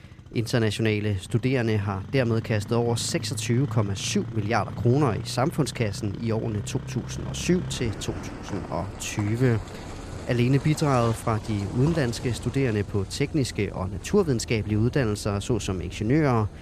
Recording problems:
traffic noise; noticeable; throughout; 10 dB below the speech

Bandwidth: 14.5 kHz